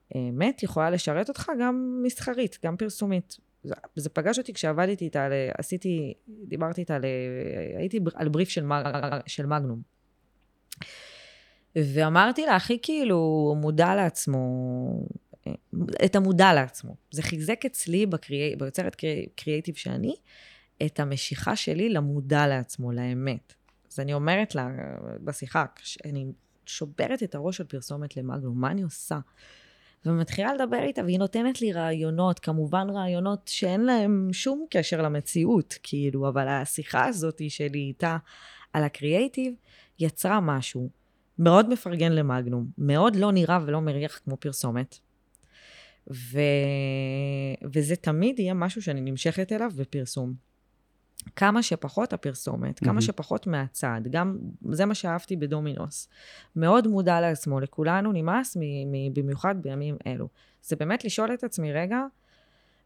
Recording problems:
audio stuttering; at 9 s

